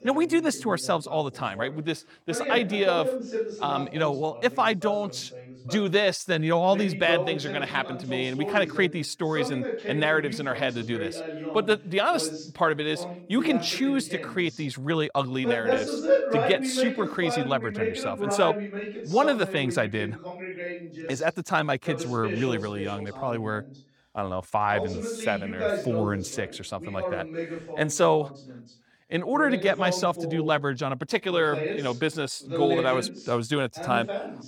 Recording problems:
voice in the background; loud; throughout; 6 dB below the speech

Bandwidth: 18 kHz